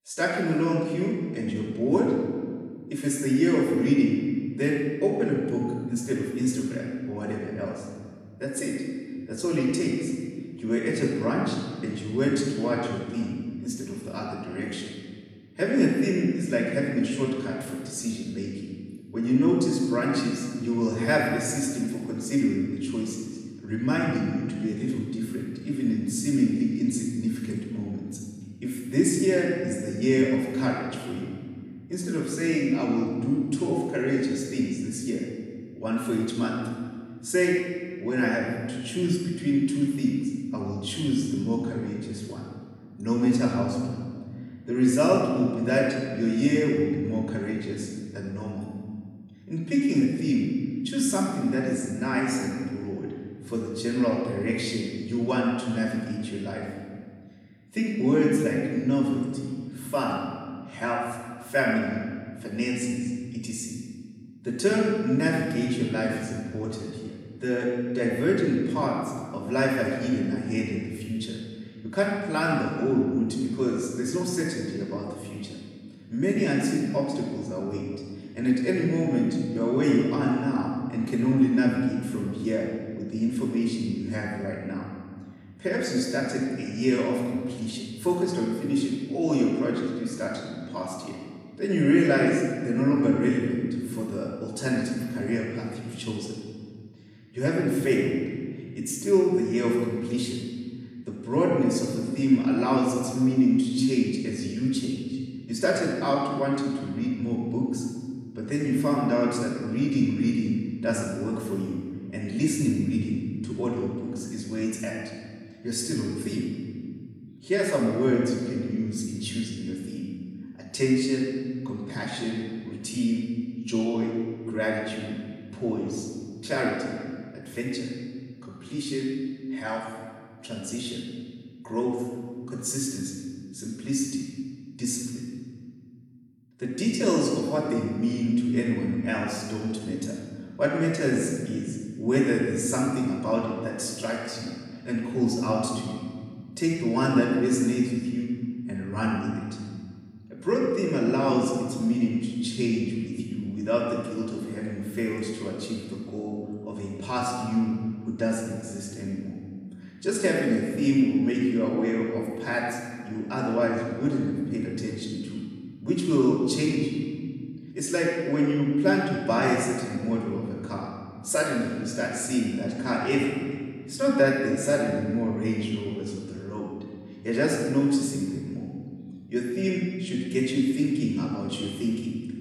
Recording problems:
off-mic speech; far
room echo; noticeable; dies away in 1.8 s

